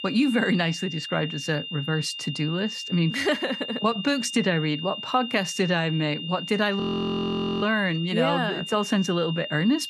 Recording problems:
high-pitched whine; loud; throughout; 3 kHz, 8 dB below the speech
audio freezing; at 7 s for 1 s

